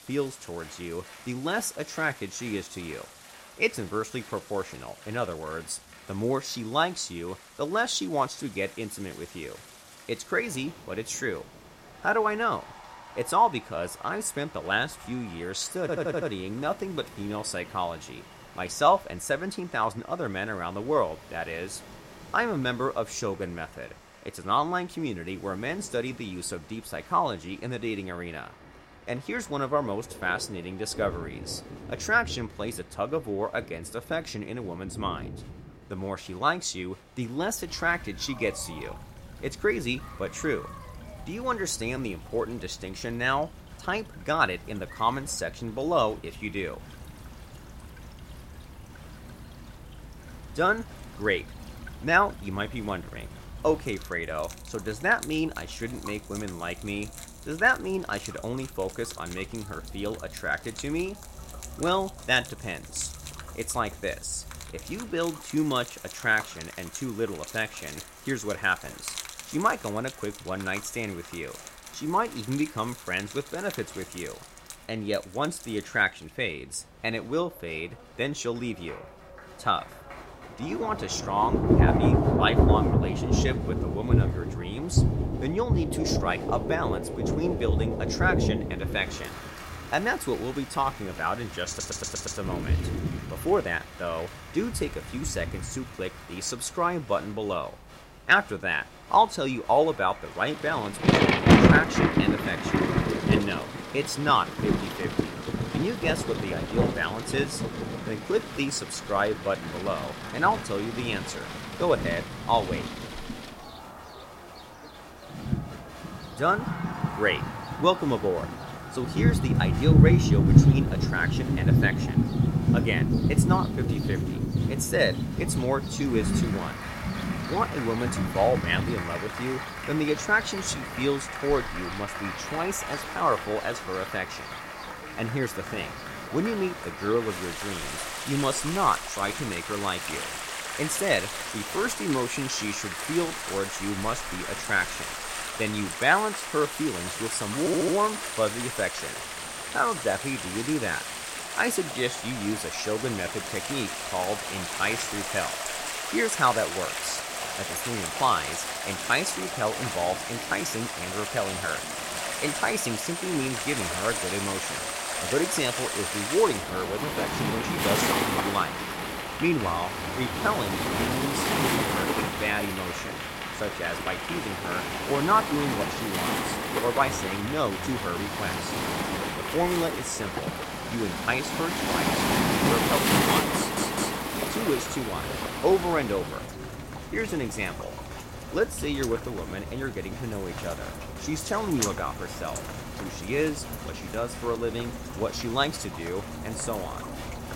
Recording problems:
rain or running water; very loud; throughout; as loud as the speech
crowd noise; noticeable; throughout; 10 dB below the speech
audio stuttering; 4 times, first at 16 s

